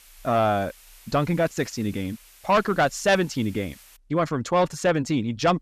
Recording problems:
distortion; slight; 10 dB below the speech
hiss; faint; until 4 s; 25 dB below the speech

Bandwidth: 14.5 kHz